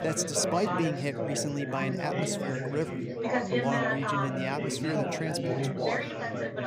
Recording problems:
chatter from many people; very loud; throughout; 1 dB above the speech

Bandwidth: 15 kHz